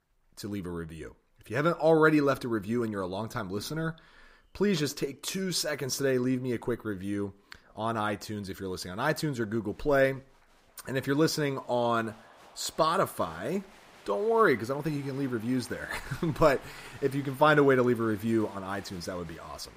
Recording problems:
crowd noise; faint; throughout; 25 dB below the speech

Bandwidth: 15.5 kHz